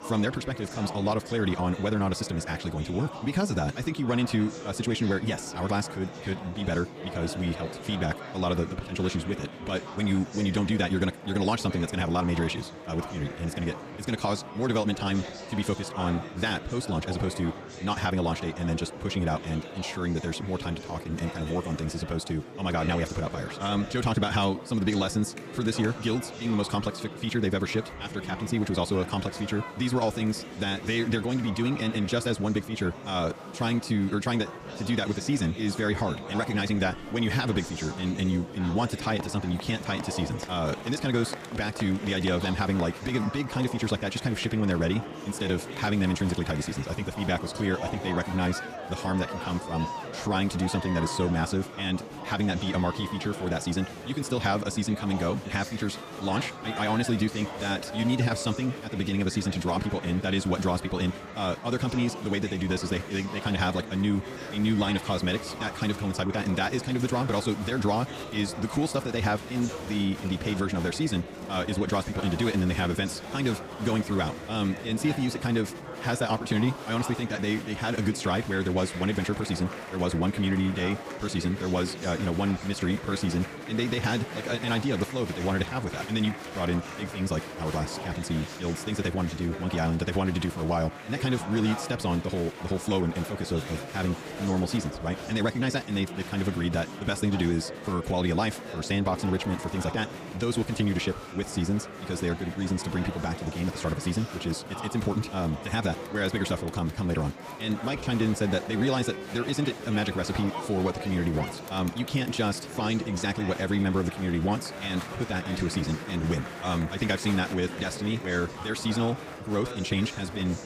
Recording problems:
wrong speed, natural pitch; too fast; 1.8 times normal speed
murmuring crowd; loud; throughout; 10 dB below the speech

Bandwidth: 15 kHz